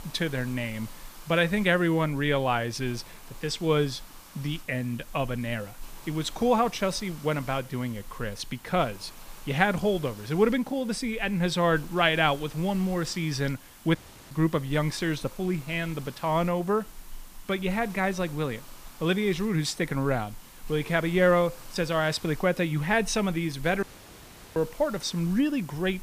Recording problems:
hiss; noticeable; throughout; 20 dB below the speech
audio cutting out; at 14 s and at 24 s for 0.5 s

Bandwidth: 15 kHz